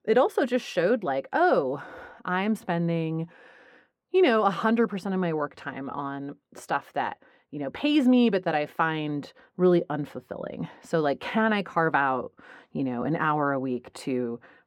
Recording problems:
muffled; slightly; fading above 2.5 kHz

